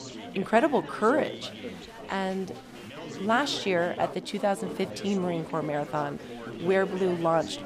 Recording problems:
chatter from many people; noticeable; throughout; 10 dB below the speech

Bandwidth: 15 kHz